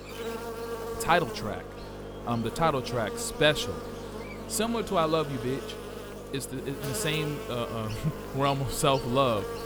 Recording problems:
electrical hum; loud; throughout; 50 Hz, 10 dB below the speech

